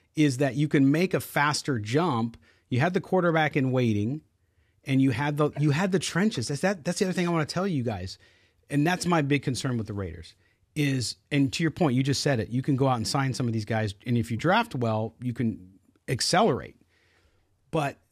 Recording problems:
none

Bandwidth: 14.5 kHz